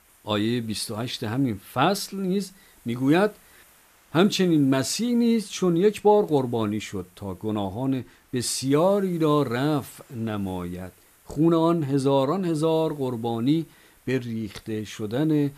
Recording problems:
hiss; faint; throughout; 30 dB below the speech

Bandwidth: 14.5 kHz